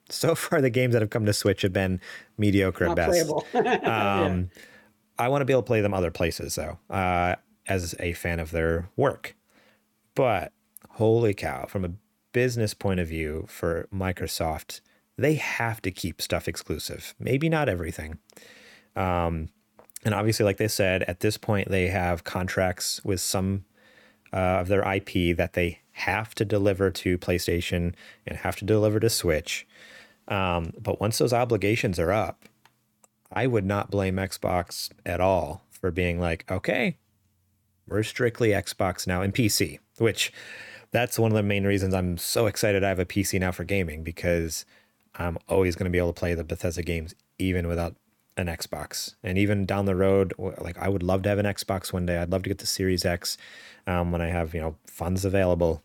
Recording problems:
none

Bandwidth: 18 kHz